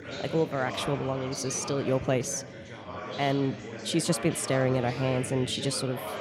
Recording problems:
chatter from many people; loud; throughout; 9 dB below the speech

